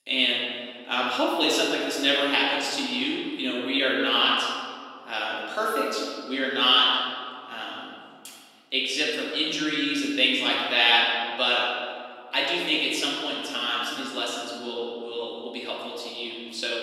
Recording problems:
room echo; strong; dies away in 1.8 s
off-mic speech; far
thin; very slightly; fading below 300 Hz

